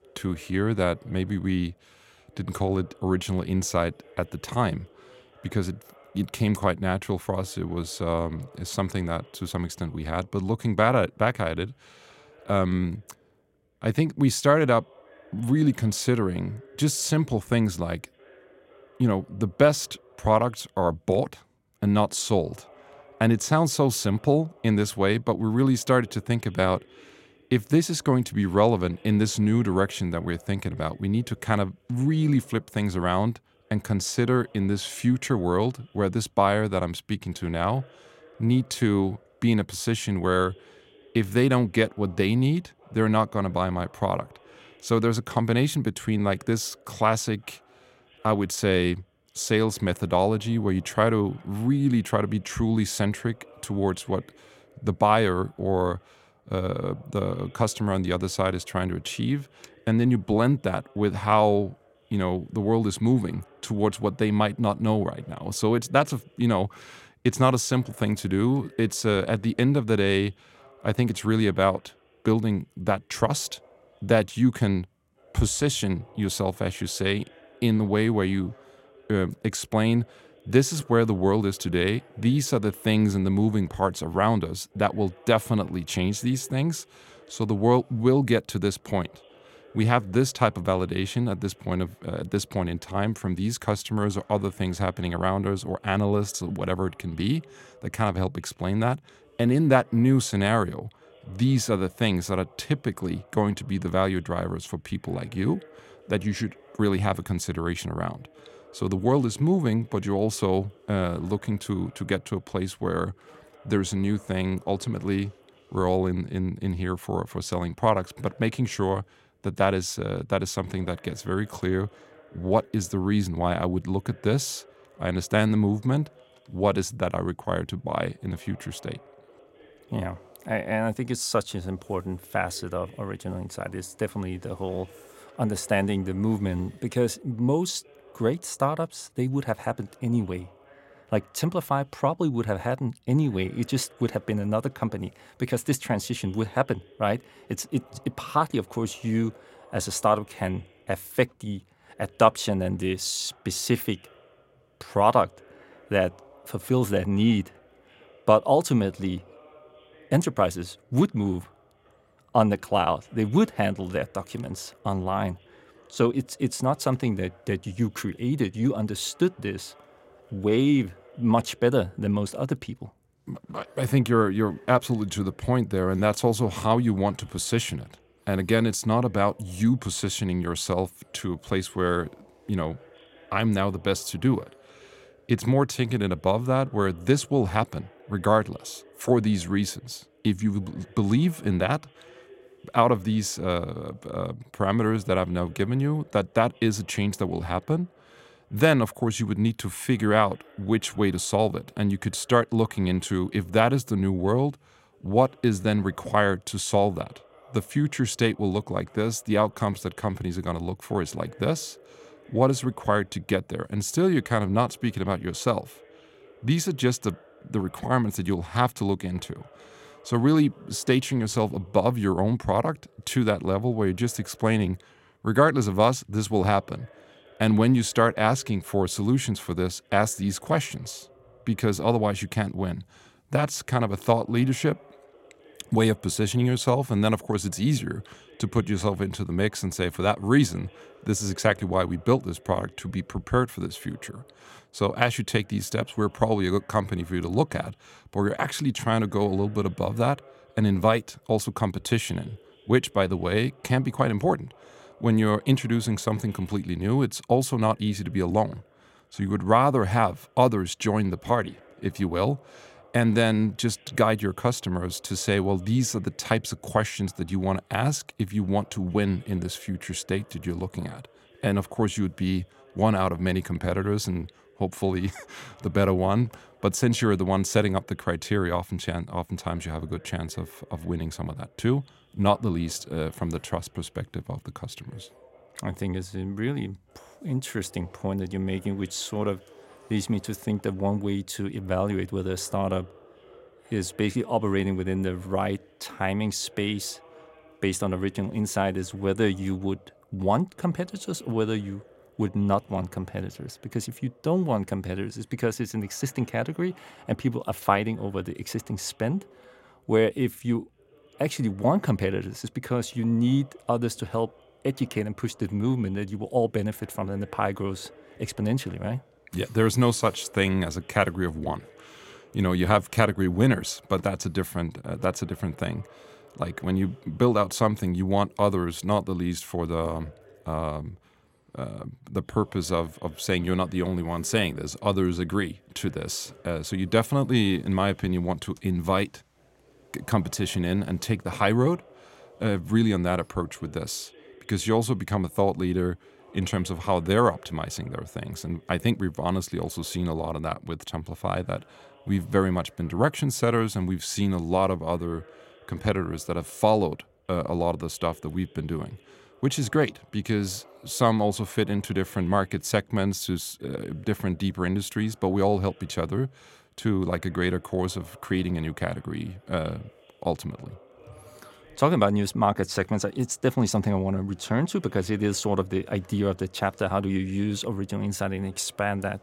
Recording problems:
voice in the background; faint; throughout; 30 dB below the speech

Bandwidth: 16 kHz